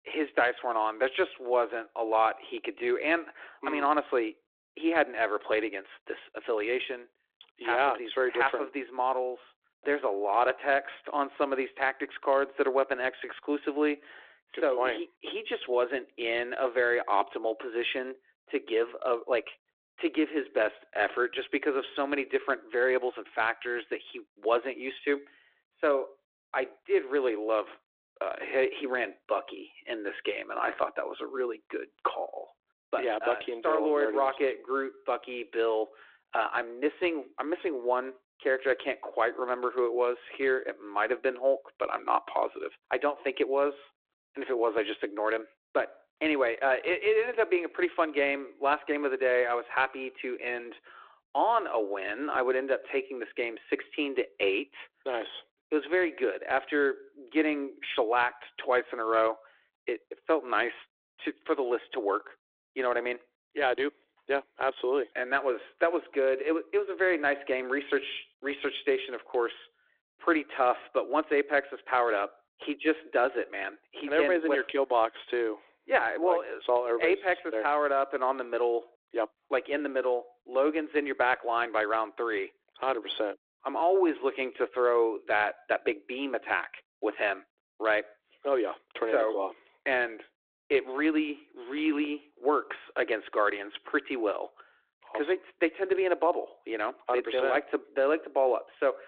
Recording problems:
phone-call audio

